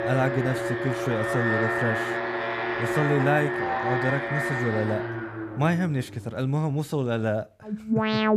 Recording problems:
alarms or sirens; very loud; throughout; as loud as the speech

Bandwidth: 14.5 kHz